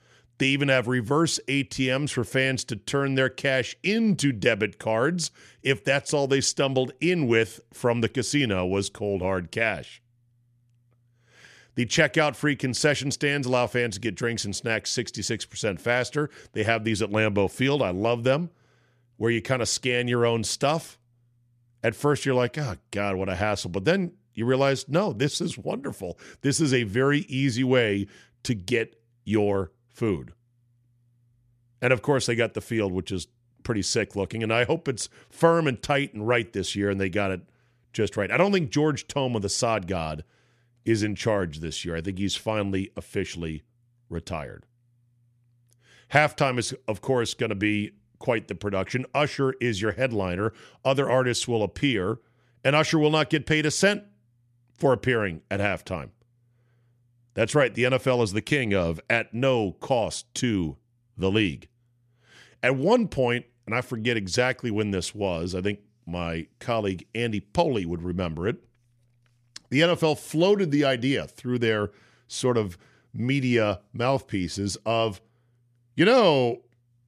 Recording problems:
none

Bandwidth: 14.5 kHz